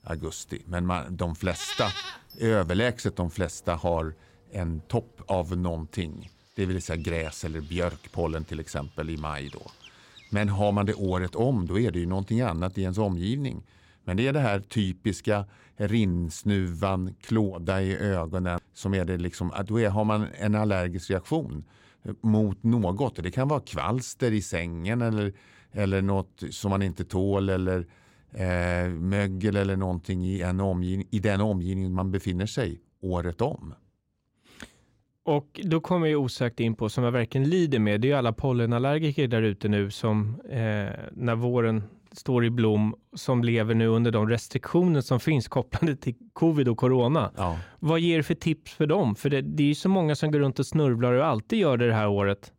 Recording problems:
animal sounds; noticeable; until 13 s; 15 dB below the speech

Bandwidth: 16 kHz